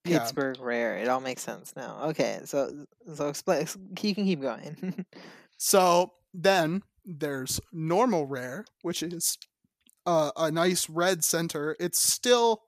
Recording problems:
none

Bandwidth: 14.5 kHz